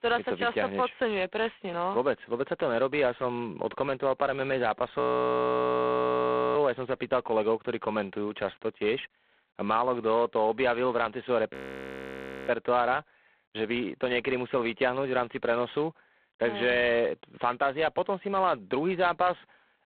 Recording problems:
phone-call audio; poor line; nothing above 4 kHz
audio freezing; at 5 s for 1.5 s and at 12 s for 1 s

